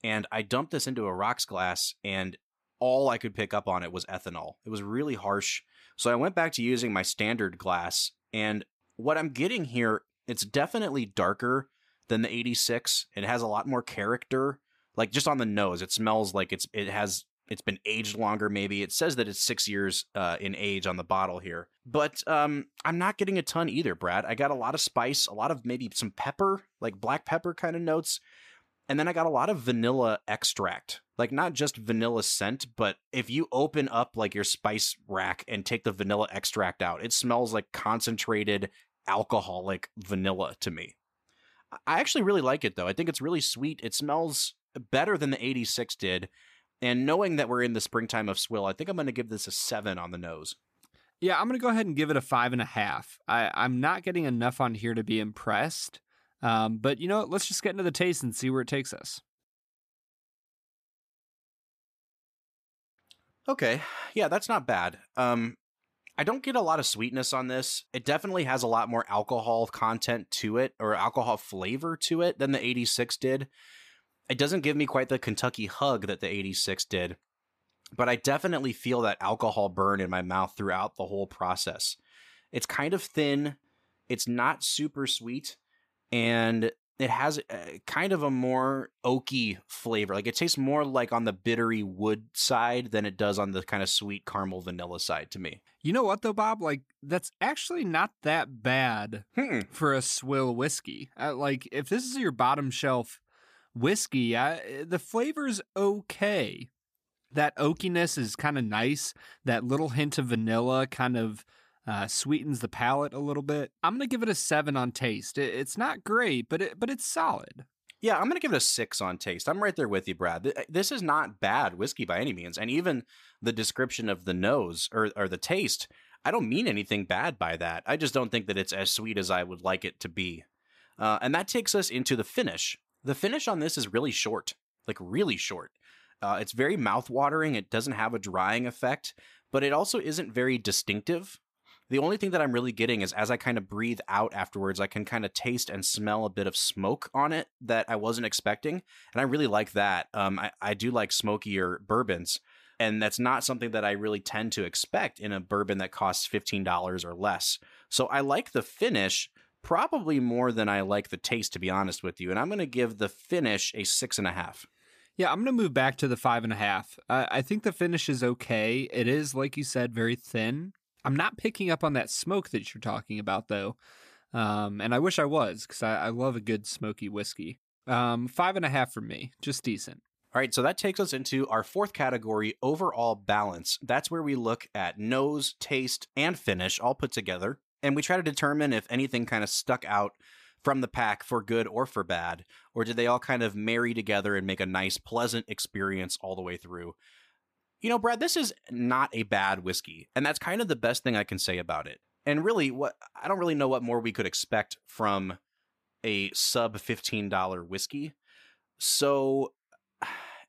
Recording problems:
none

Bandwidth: 14.5 kHz